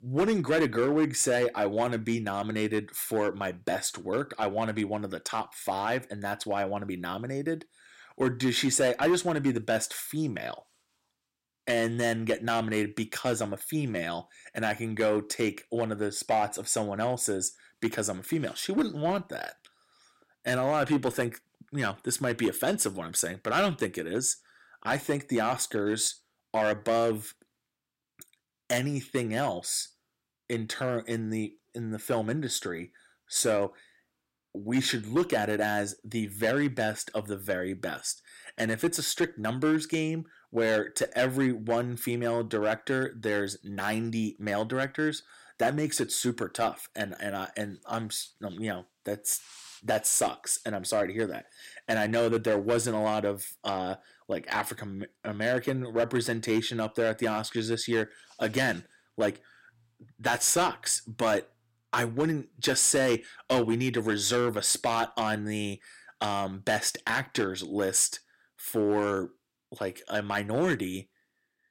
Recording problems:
distortion; slight; 3% of the sound clipped

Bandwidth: 16 kHz